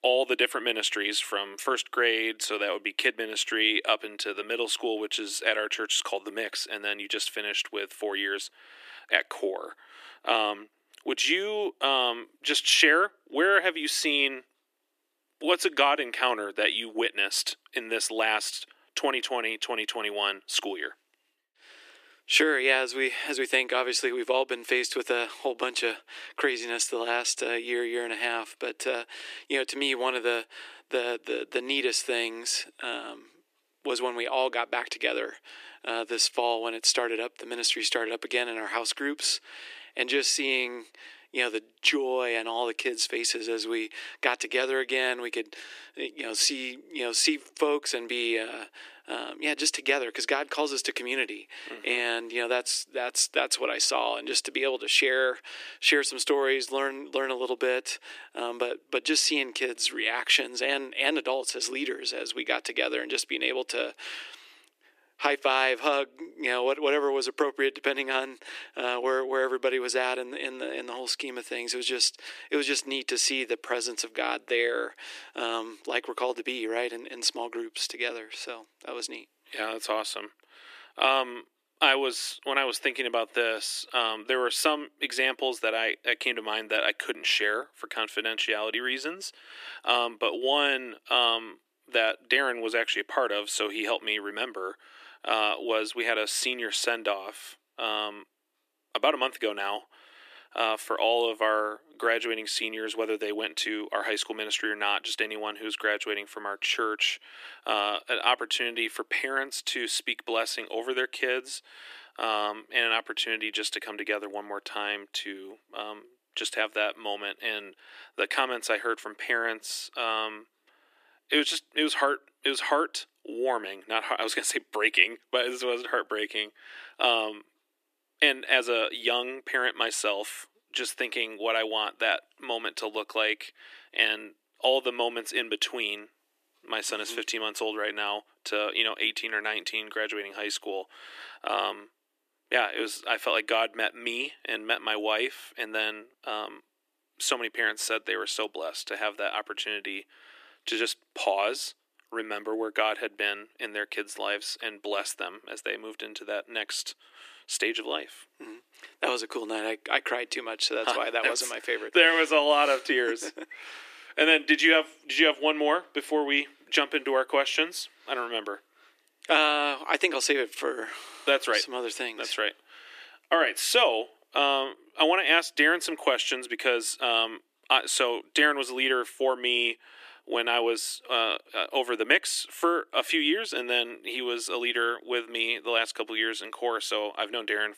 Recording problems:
thin; very; fading below 300 Hz

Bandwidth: 14.5 kHz